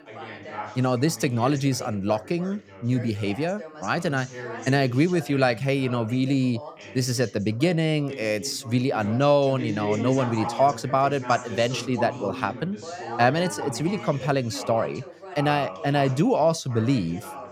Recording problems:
background chatter; noticeable; throughout; 2 voices, 10 dB below the speech

